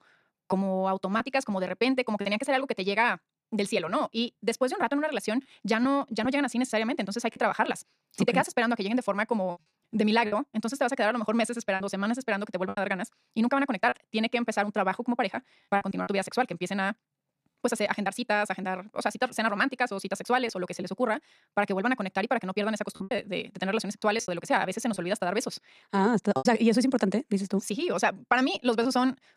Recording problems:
wrong speed, natural pitch; too fast; 1.6 times normal speed
choppy; occasionally; 4% of the speech affected

